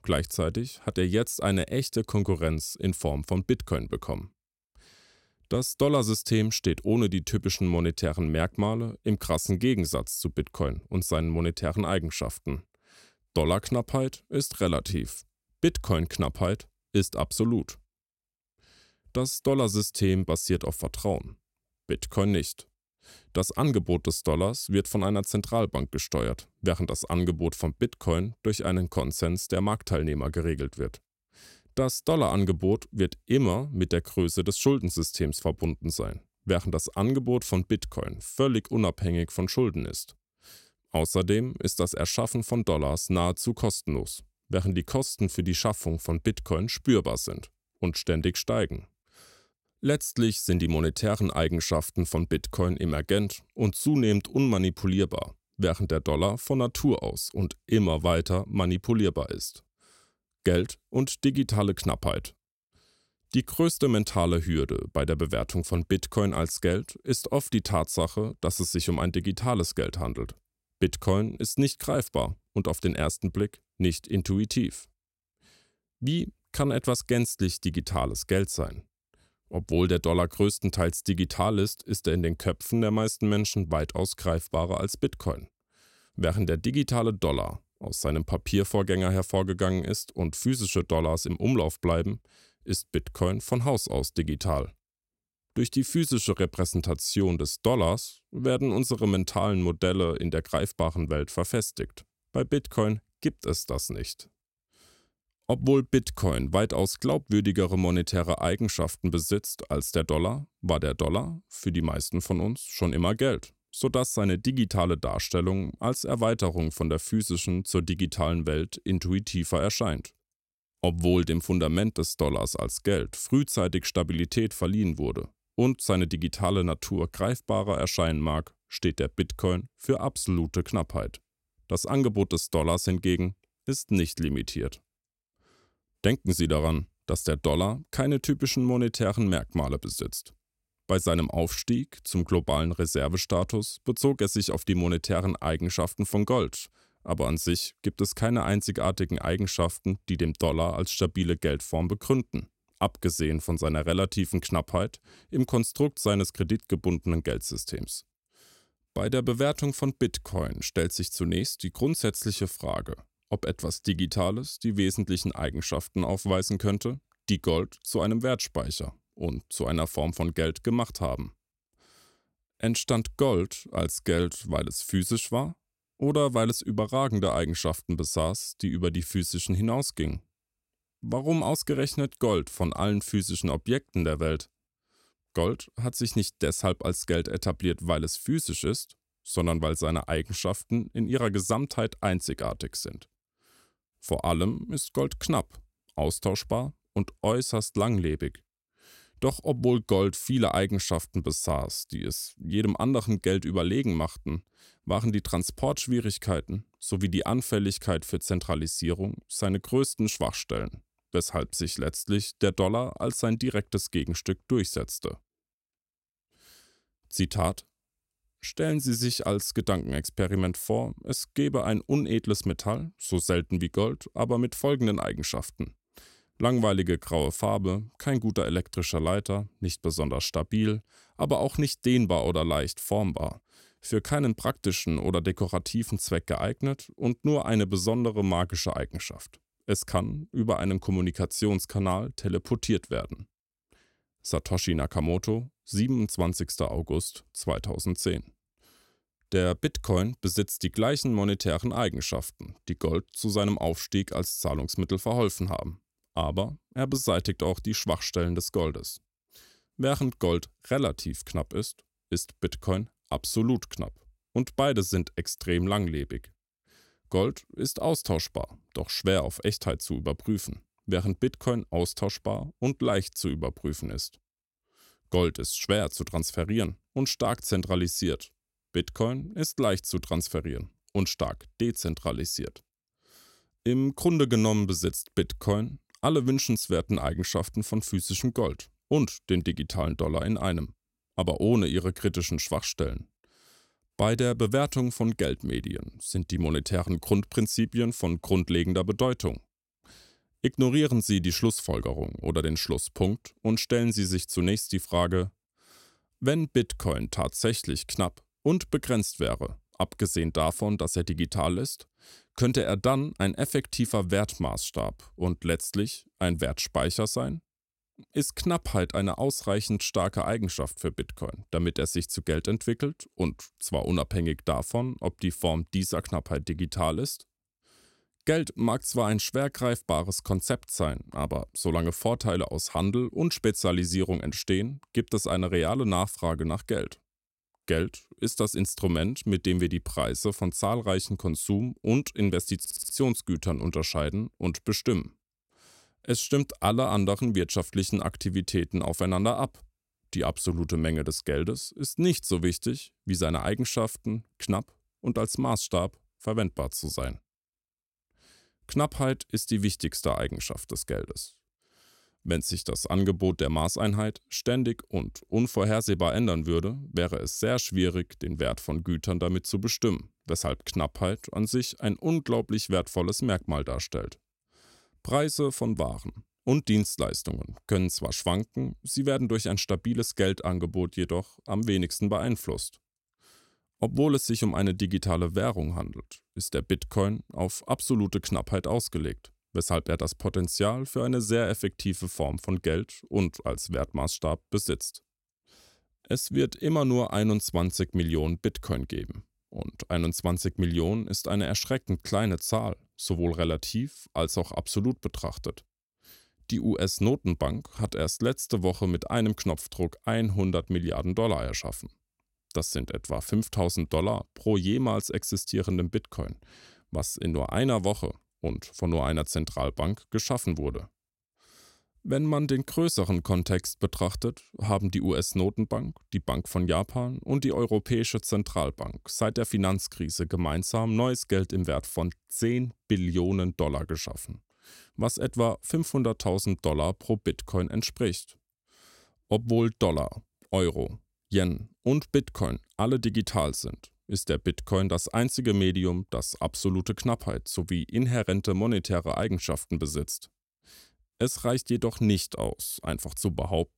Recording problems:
audio stuttering; at 5:43

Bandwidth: 16 kHz